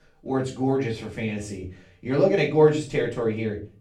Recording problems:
off-mic speech; far
room echo; slight; dies away in 0.3 s

